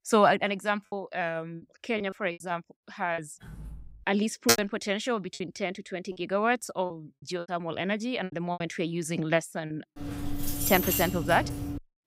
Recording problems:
choppy; very; 8% of the speech affected
door banging; faint; at 3.5 s; peak 15 dB below the speech
keyboard typing; loud; at 4.5 s; peak 4 dB above the speech
jangling keys; loud; from 10 s on; peak 3 dB above the speech

